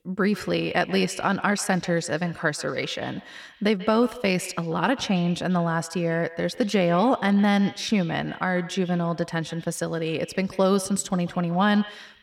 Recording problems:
echo of what is said; noticeable; throughout; 140 ms later, 20 dB below the speech

